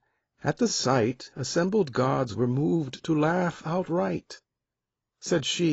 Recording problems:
garbled, watery; badly; nothing above 7.5 kHz
abrupt cut into speech; at the end

